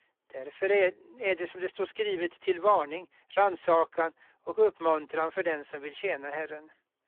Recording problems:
phone-call audio; poor line

